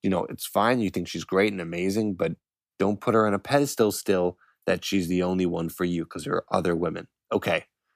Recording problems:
none

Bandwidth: 15 kHz